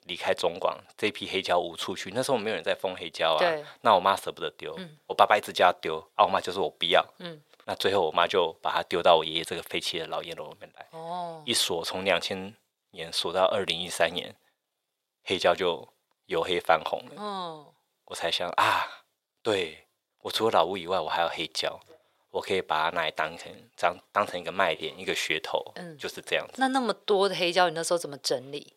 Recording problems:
thin; very; fading below 550 Hz

